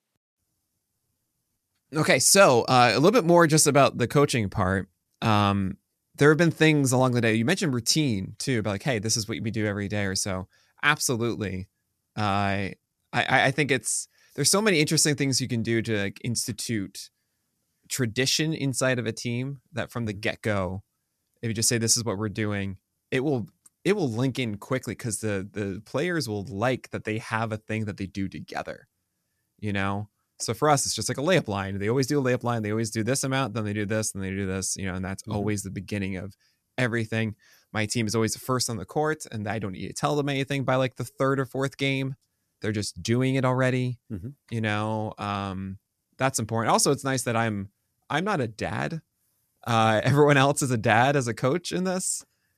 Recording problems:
none

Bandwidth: 14 kHz